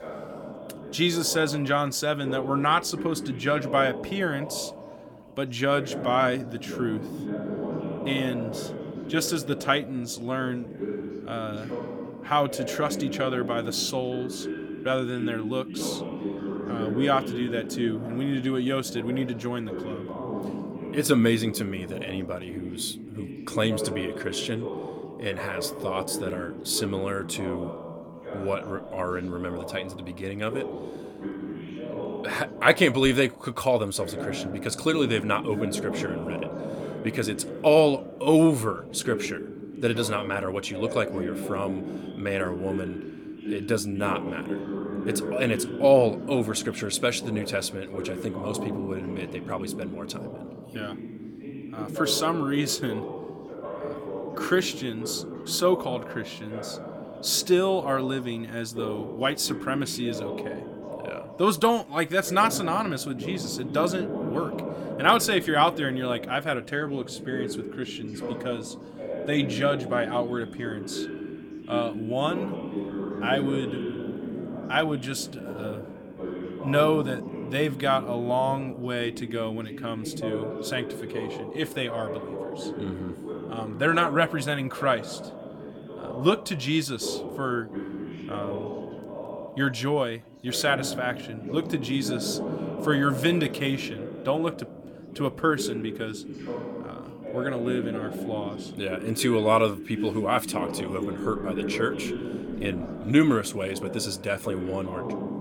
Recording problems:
background chatter; loud; throughout; 2 voices, 8 dB below the speech

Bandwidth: 17.5 kHz